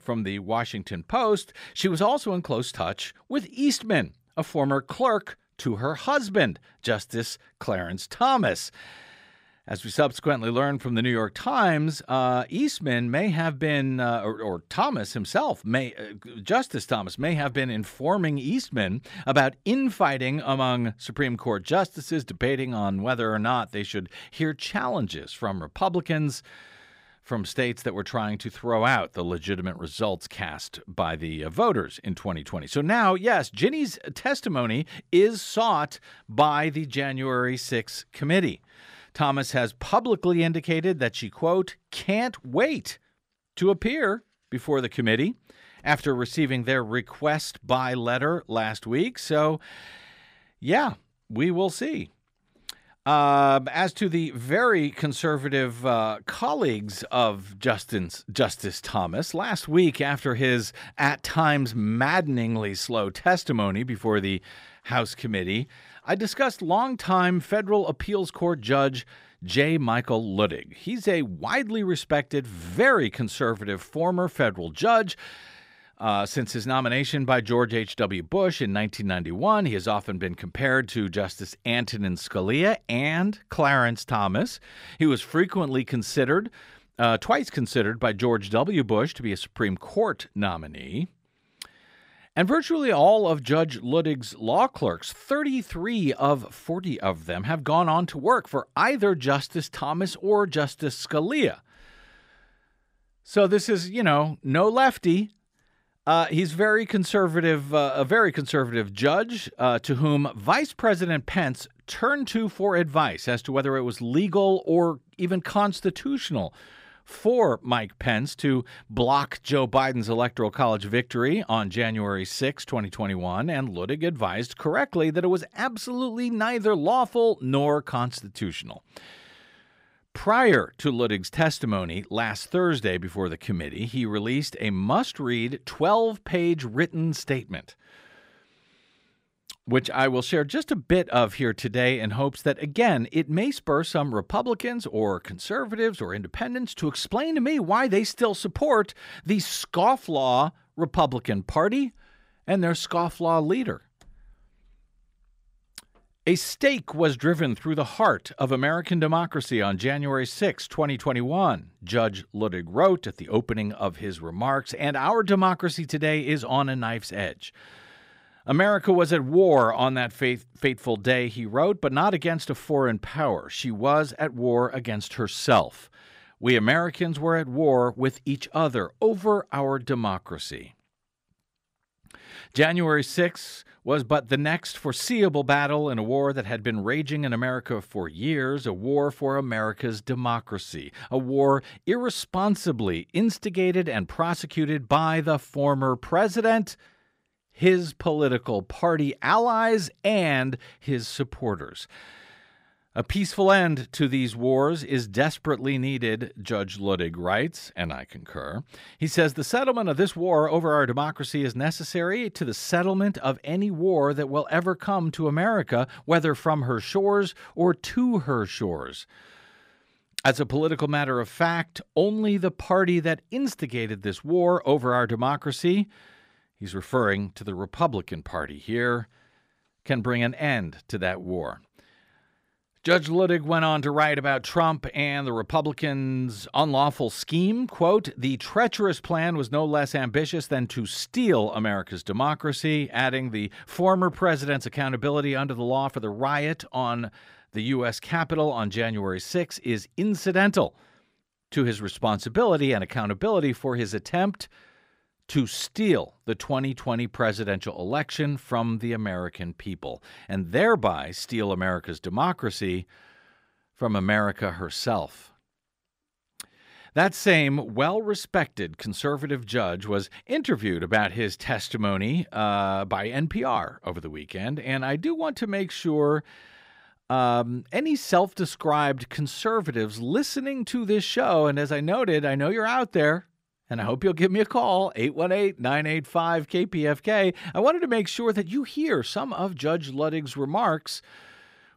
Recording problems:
none

